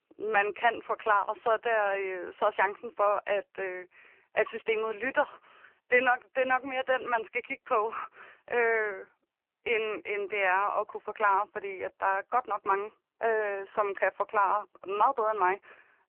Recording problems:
phone-call audio; poor line; nothing above 3 kHz

